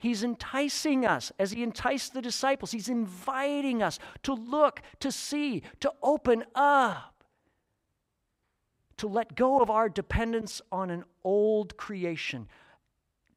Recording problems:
none

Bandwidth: 15.5 kHz